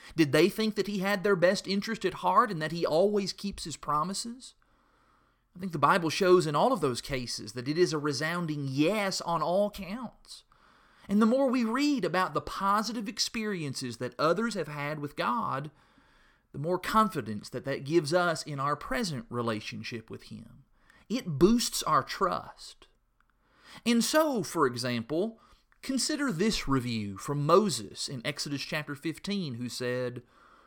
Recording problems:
none

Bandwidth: 17 kHz